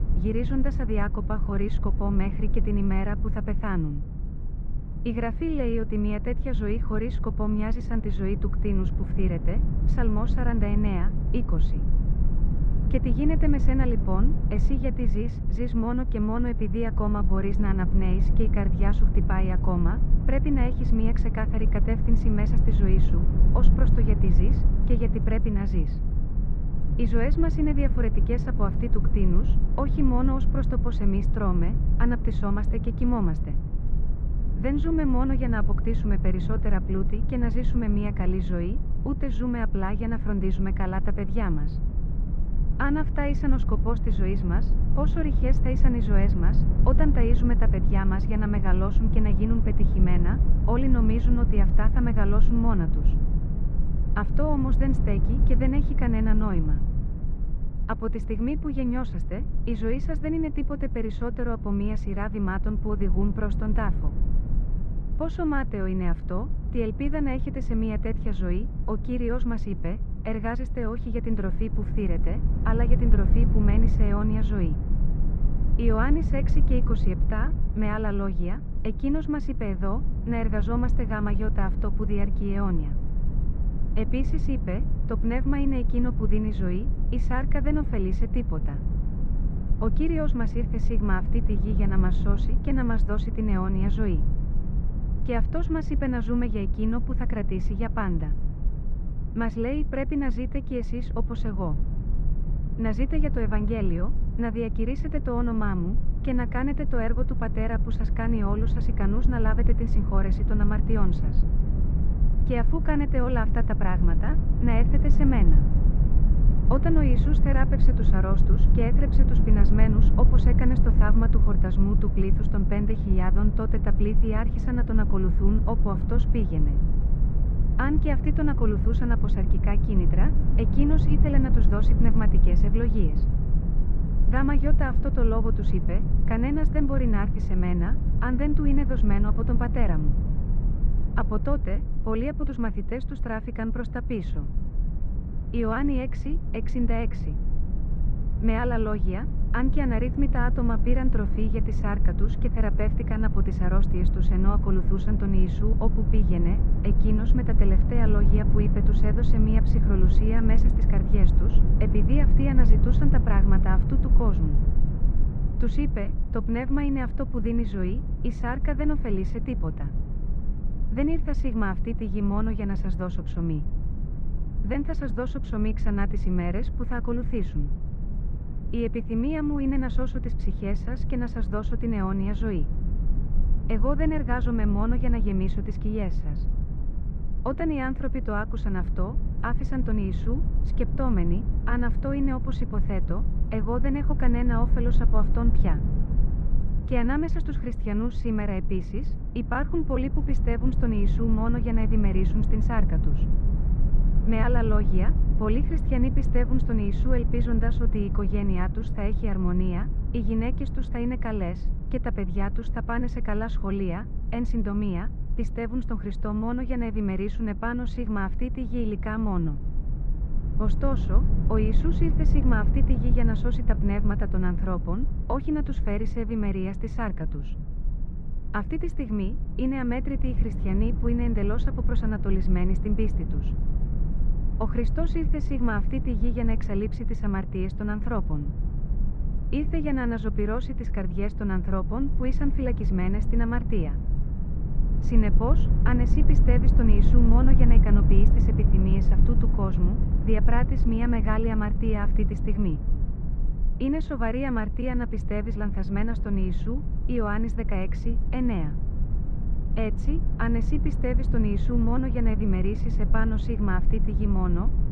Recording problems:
muffled; very; fading above 2 kHz
low rumble; loud; throughout; 9 dB below the speech

